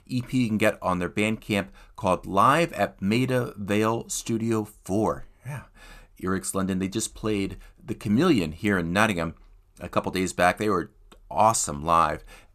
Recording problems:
none

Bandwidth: 14.5 kHz